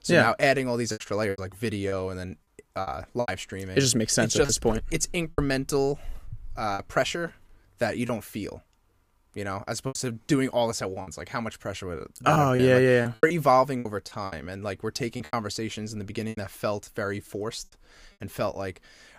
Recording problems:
choppy; very; 8% of the speech affected

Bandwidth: 15 kHz